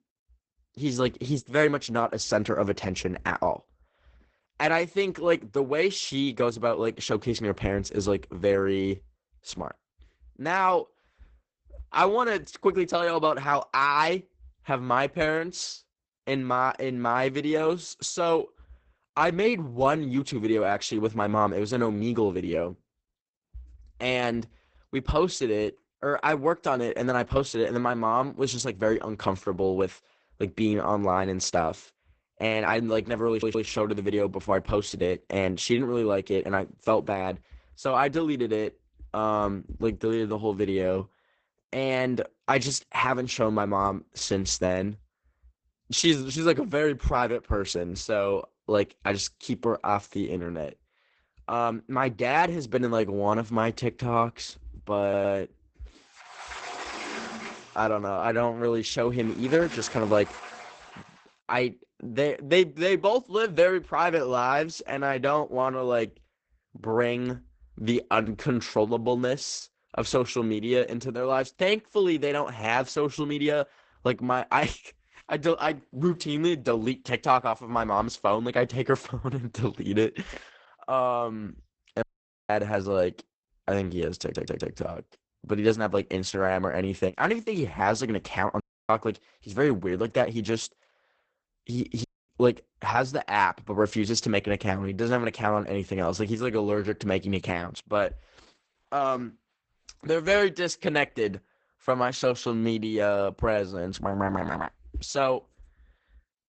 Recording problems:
garbled, watery; badly; nothing above 8 kHz
audio stuttering; at 33 s, at 55 s and at 1:24
door banging; noticeable; from 56 s to 1:01; peak 7 dB below the speech
audio cutting out; at 1:22, at 1:29 and at 1:32

